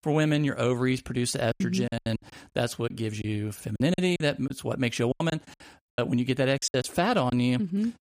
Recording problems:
choppy; very; 12% of the speech affected

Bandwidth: 15 kHz